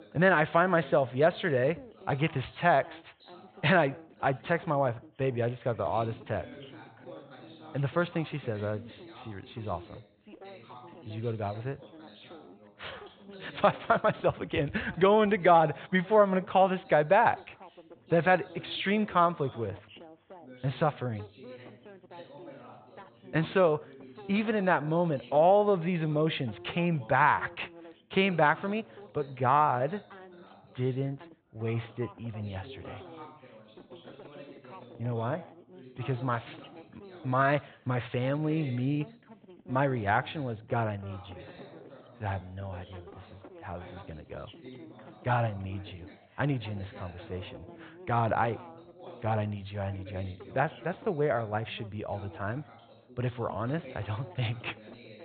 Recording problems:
high frequencies cut off; severe; nothing above 4 kHz
background chatter; faint; throughout; 2 voices, 20 dB below the speech

